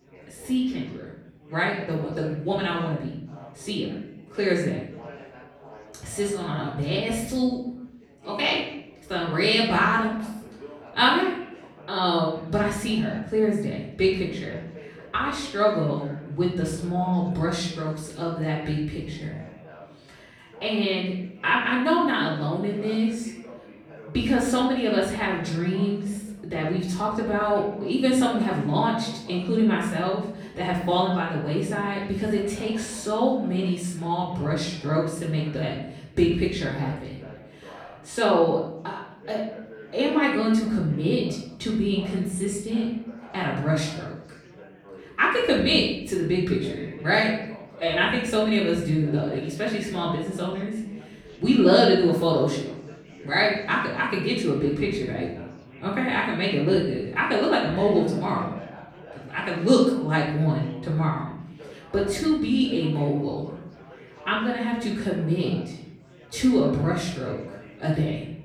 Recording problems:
off-mic speech; far
room echo; noticeable; dies away in 0.7 s
chatter from many people; faint; throughout; 20 dB below the speech

